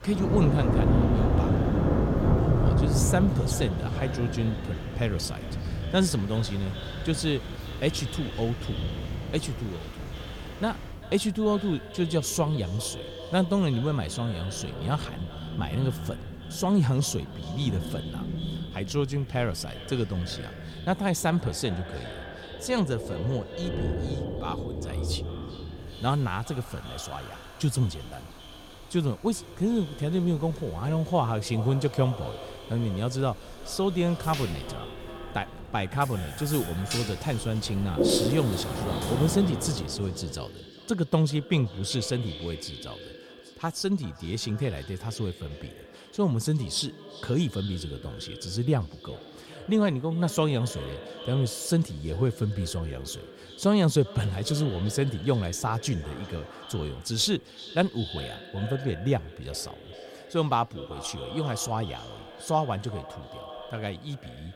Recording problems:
echo of what is said; noticeable; throughout; 390 ms later, 15 dB below the speech
rain or running water; loud; until 40 s; 2 dB below the speech

